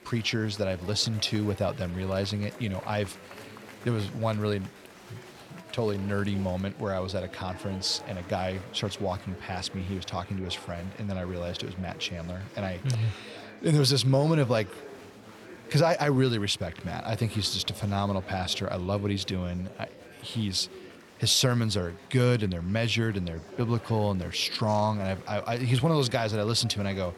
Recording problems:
murmuring crowd; noticeable; throughout; 15 dB below the speech

